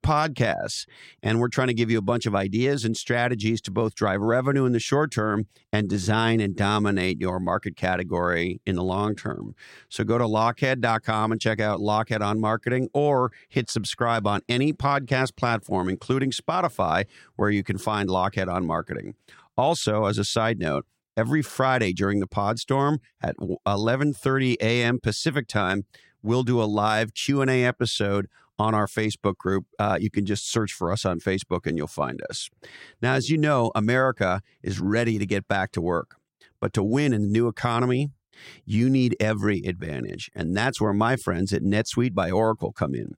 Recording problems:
none

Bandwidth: 16.5 kHz